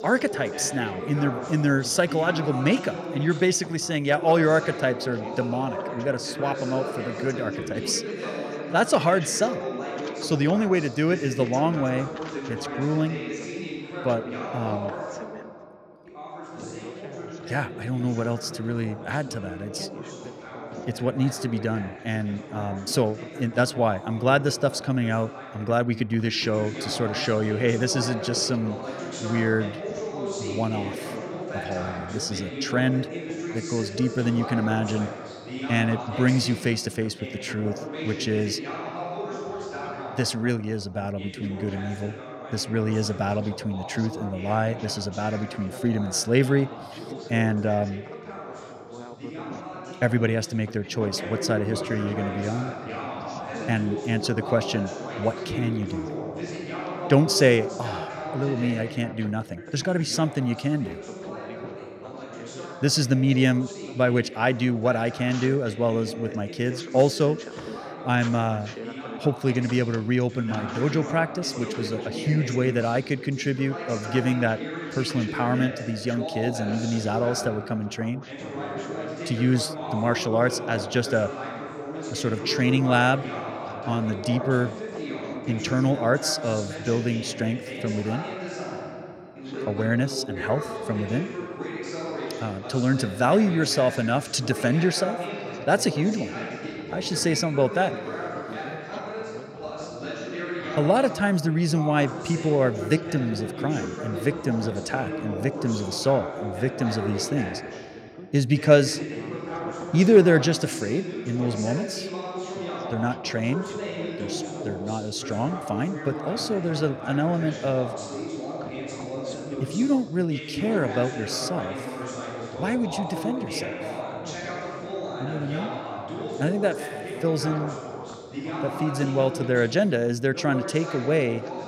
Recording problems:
background chatter; loud; throughout; 2 voices, 8 dB below the speech

